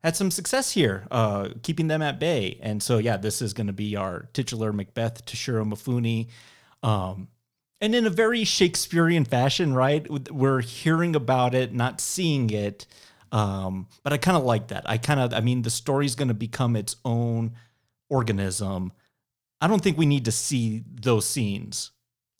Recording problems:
none

